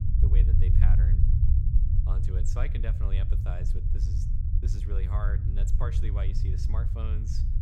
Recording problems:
low rumble; loud; throughout; as loud as the speech

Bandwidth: 16.5 kHz